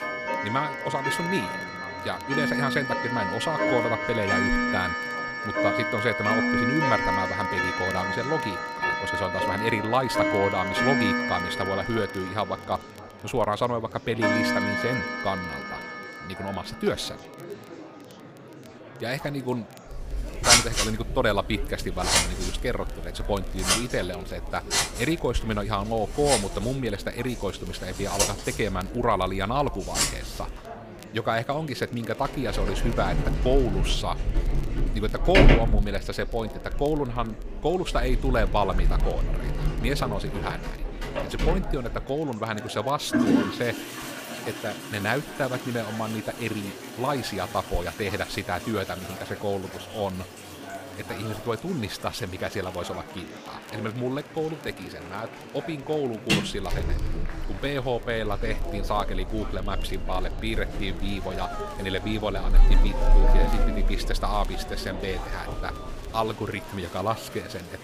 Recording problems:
household noises; very loud; throughout; 2 dB above the speech
murmuring crowd; noticeable; throughout; 10 dB below the speech
crackle, like an old record; faint; 25 dB below the speech

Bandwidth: 15 kHz